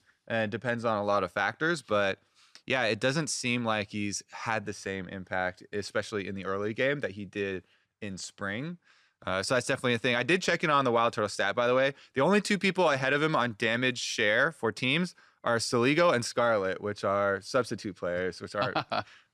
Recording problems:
none

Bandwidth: 14 kHz